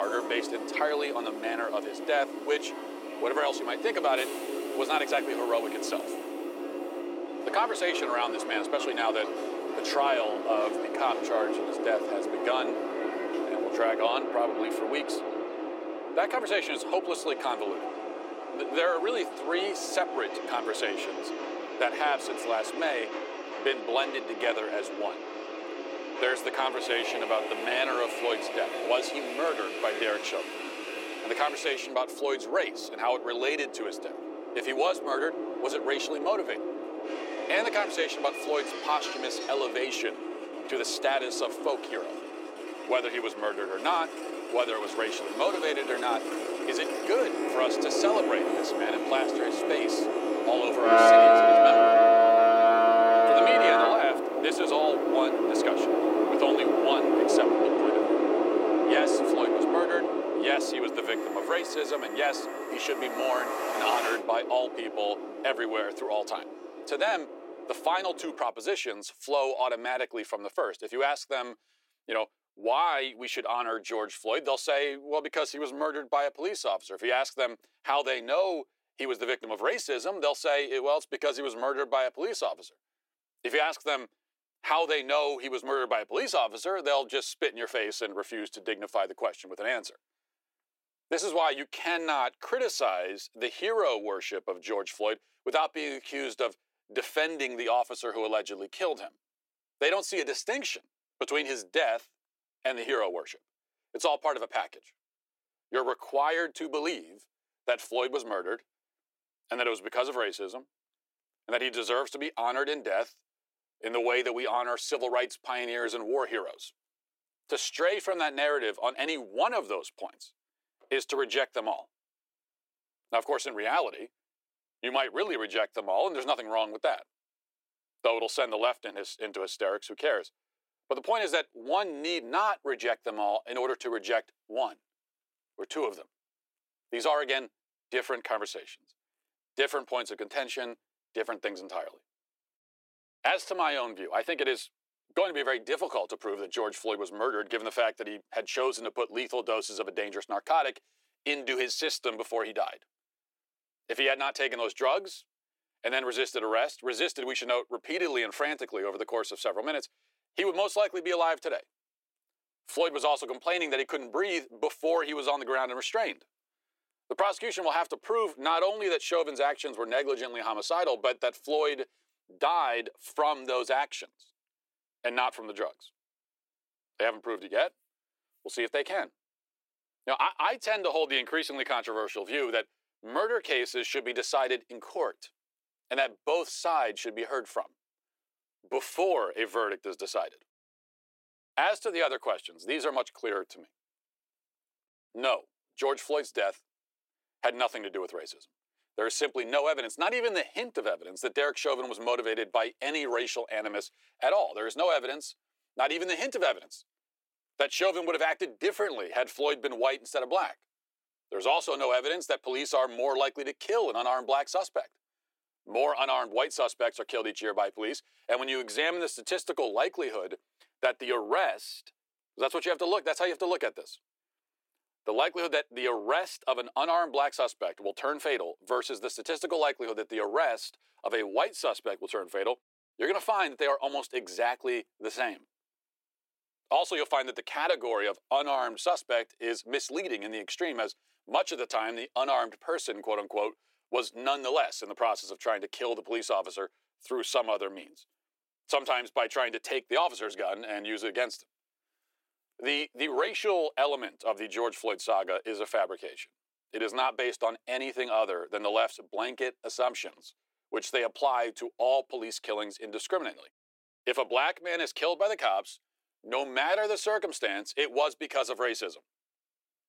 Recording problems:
thin; very; fading below 350 Hz
train or aircraft noise; very loud; until 1:08; 2 dB above the speech
abrupt cut into speech; at the start

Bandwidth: 16.5 kHz